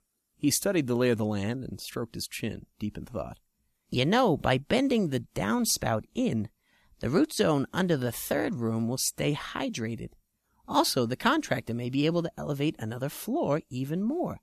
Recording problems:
none

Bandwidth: 14 kHz